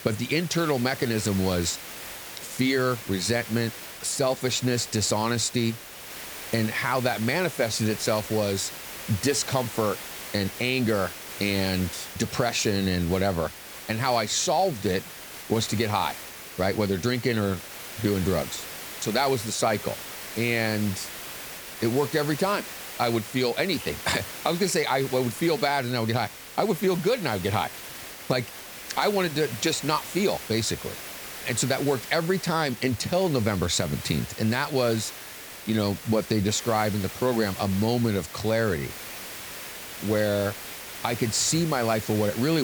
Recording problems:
hiss; noticeable; throughout; 10 dB below the speech
crackling; very faint; from 34 to 36 s; 25 dB below the speech
abrupt cut into speech; at the end

